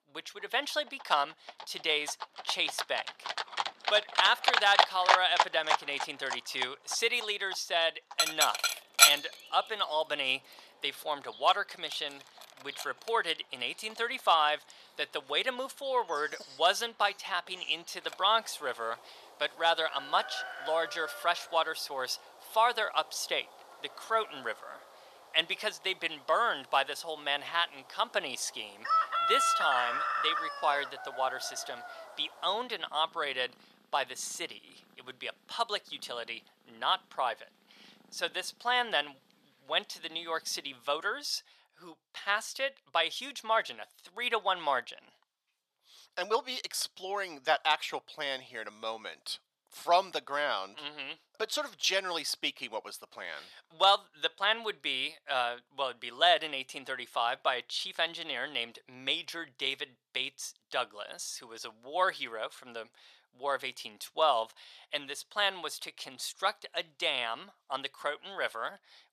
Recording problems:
thin; very; fading below 700 Hz
animal sounds; very loud; until 41 s; 2 dB above the speech

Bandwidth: 14 kHz